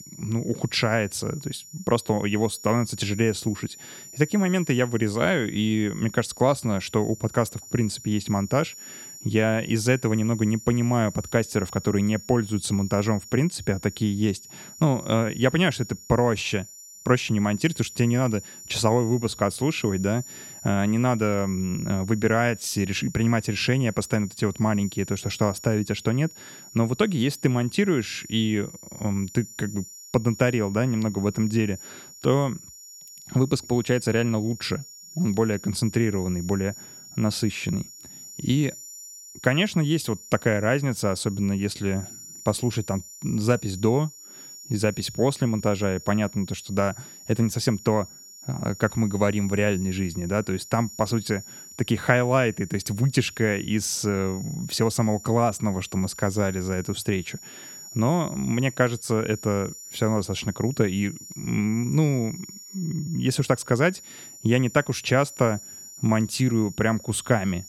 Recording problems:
high-pitched whine; noticeable; throughout; 7 kHz, 15 dB below the speech

